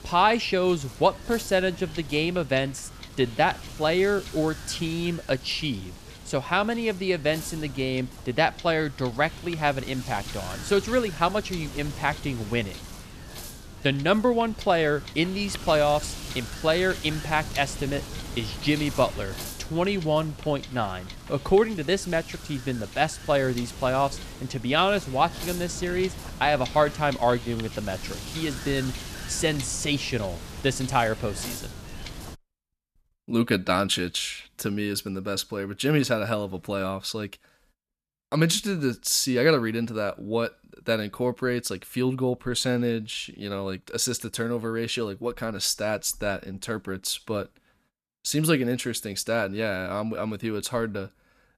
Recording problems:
wind noise on the microphone; occasional gusts; until 32 s; 15 dB below the speech

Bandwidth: 14.5 kHz